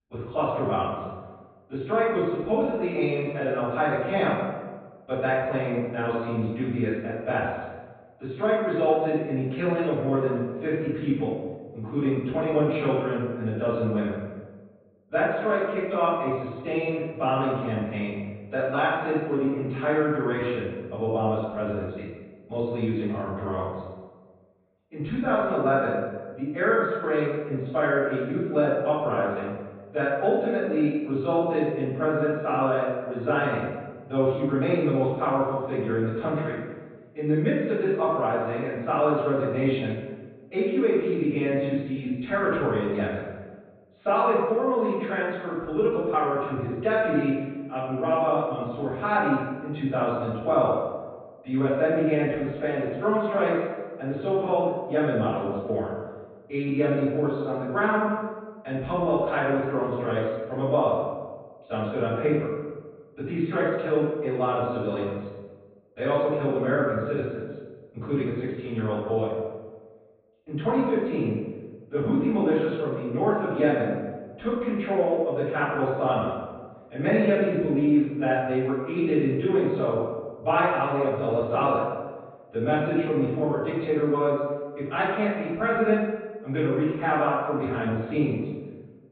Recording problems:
room echo; strong; dies away in 1.2 s
off-mic speech; far
high frequencies cut off; severe; nothing above 4 kHz

